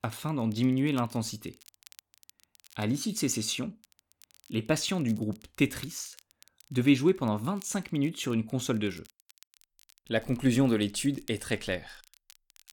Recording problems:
crackle, like an old record; faint; 25 dB below the speech

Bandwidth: 18 kHz